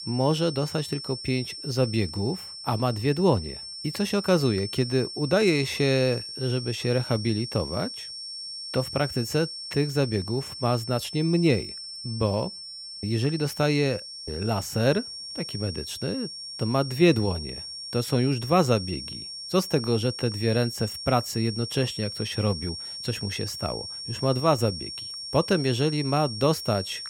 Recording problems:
high-pitched whine; loud; throughout; 5.5 kHz, 8 dB below the speech

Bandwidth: 17 kHz